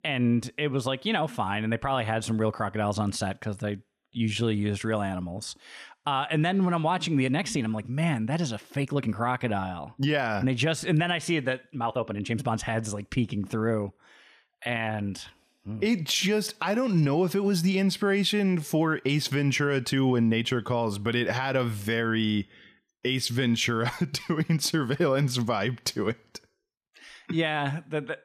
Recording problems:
uneven, jittery; strongly; from 4 to 17 s

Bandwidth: 14.5 kHz